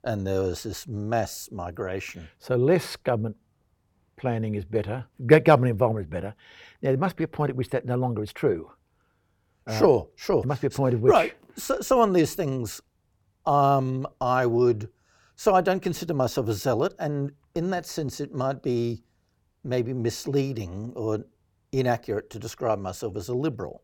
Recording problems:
none

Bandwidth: 18 kHz